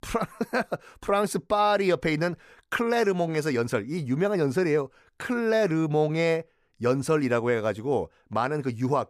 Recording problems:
none

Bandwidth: 15 kHz